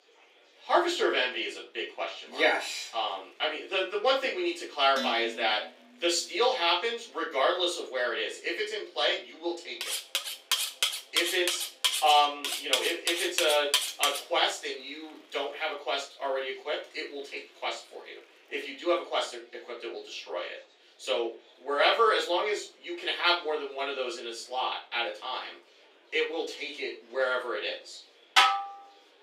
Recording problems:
off-mic speech; far
thin; very; fading below 350 Hz
room echo; slight; dies away in 0.3 s
murmuring crowd; faint; throughout; 30 dB below the speech
background music; very faint; until 16 s, mostly in the pauses; 70 dB below the speech
clattering dishes; noticeable; at 5 s; peak 6 dB below the speech
clattering dishes; loud; from 10 to 14 s and at 28 s; peak 7 dB above the speech

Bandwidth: 15.5 kHz